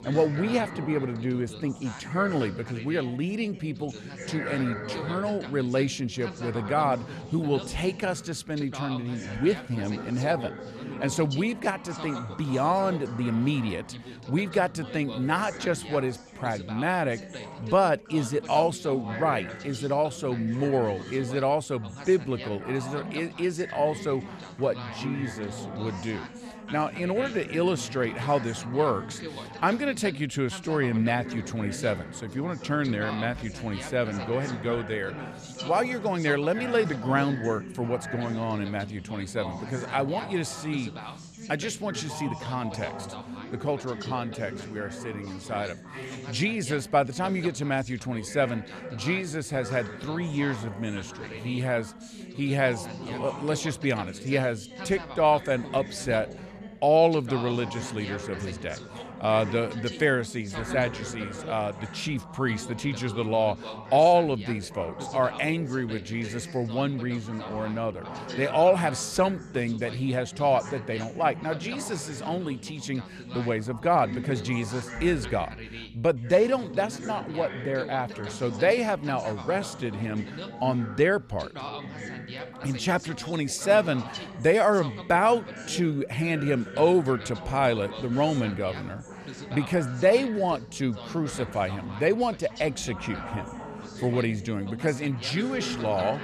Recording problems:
background chatter; noticeable; throughout; 3 voices, 10 dB below the speech

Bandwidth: 13.5 kHz